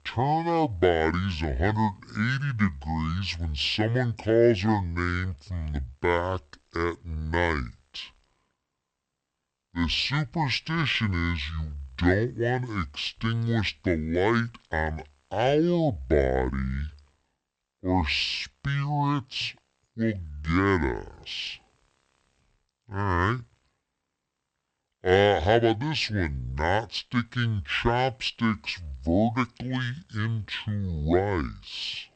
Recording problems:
wrong speed and pitch; too slow and too low; 0.6 times normal speed

